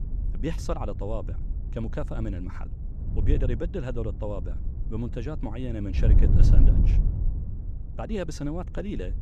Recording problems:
wind noise on the microphone; heavy; 7 dB below the speech

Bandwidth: 14 kHz